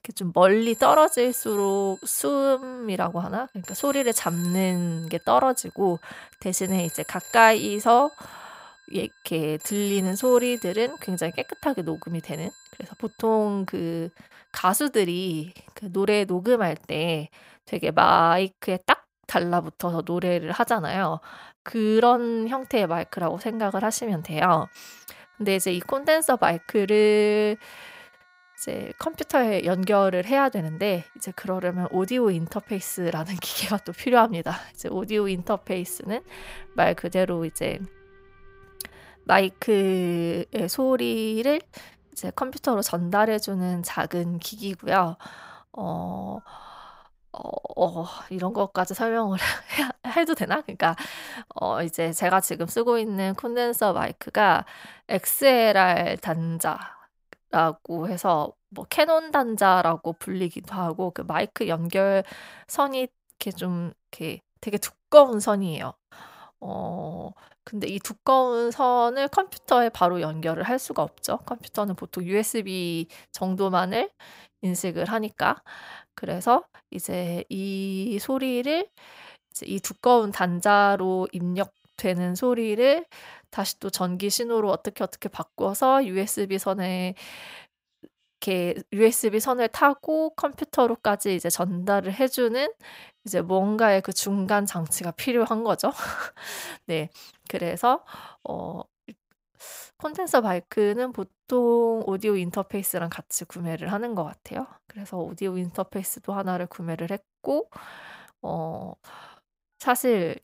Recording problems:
alarms or sirens; noticeable; throughout; 20 dB below the speech

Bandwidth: 15.5 kHz